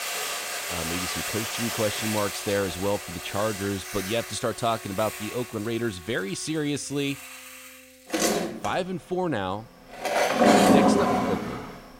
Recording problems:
household noises; very loud; throughout; 4 dB above the speech
background music; faint; throughout; 25 dB below the speech

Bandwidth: 16 kHz